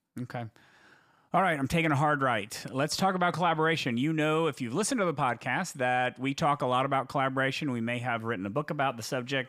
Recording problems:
none

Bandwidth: 15 kHz